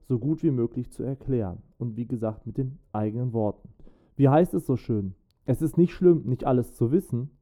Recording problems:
muffled; very; fading above 1 kHz

